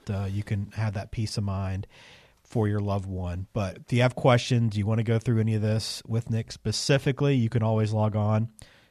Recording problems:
none

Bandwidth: 14 kHz